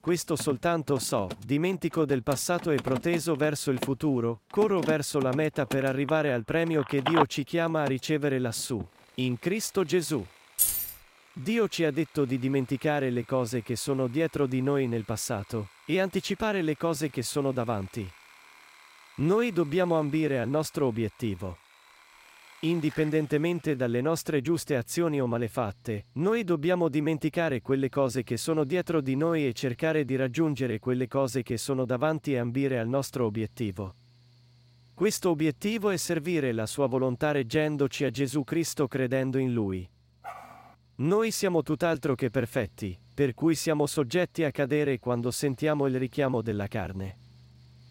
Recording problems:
machinery noise; noticeable; throughout; 20 dB below the speech
phone ringing; loud; from 6 to 9 s; peak 1 dB above the speech
jangling keys; loud; at 11 s; peak 4 dB above the speech
dog barking; faint; at 40 s; peak 15 dB below the speech

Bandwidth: 16 kHz